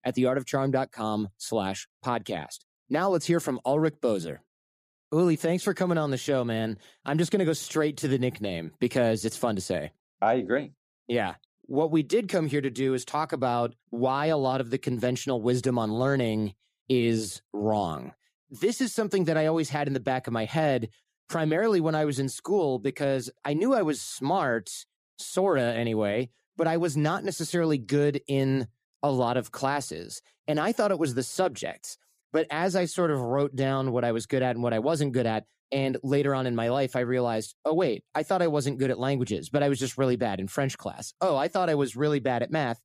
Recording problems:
none

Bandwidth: 14.5 kHz